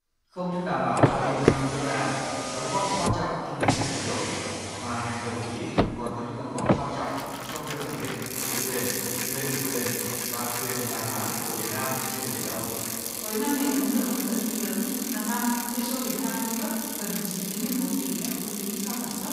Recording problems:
room echo; strong; dies away in 2.2 s
off-mic speech; far
traffic noise; very loud; throughout; 1 dB above the speech

